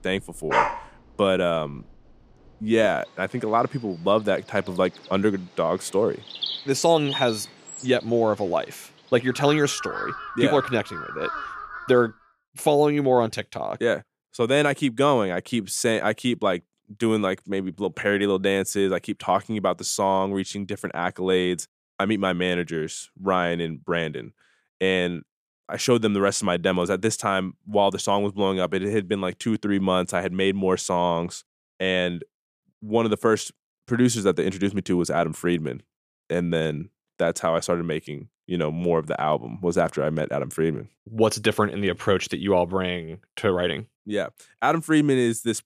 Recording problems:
animal sounds; loud; until 12 s; 7 dB below the speech

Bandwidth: 14.5 kHz